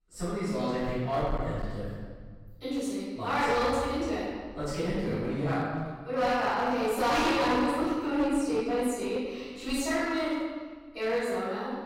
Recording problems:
room echo; strong; dies away in 1.4 s
off-mic speech; far
distortion; slight; 10% of the sound clipped

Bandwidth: 16 kHz